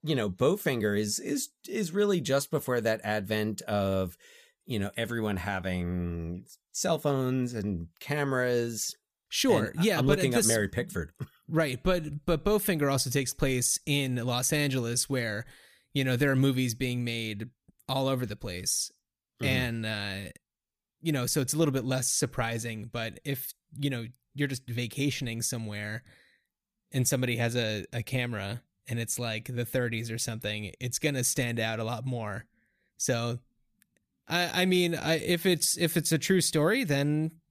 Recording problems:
none

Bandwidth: 15 kHz